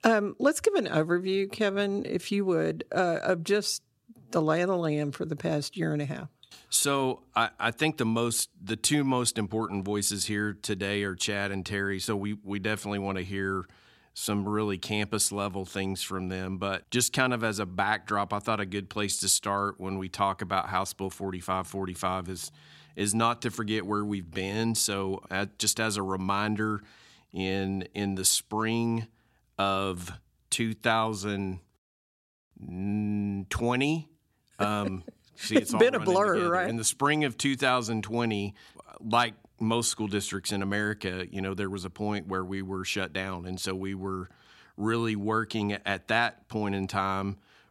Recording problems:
none

